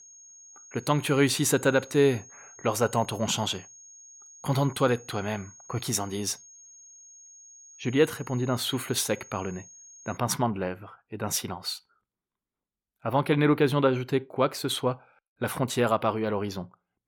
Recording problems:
high-pitched whine; faint; until 10 s; 6.5 kHz, 20 dB below the speech

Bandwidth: 17.5 kHz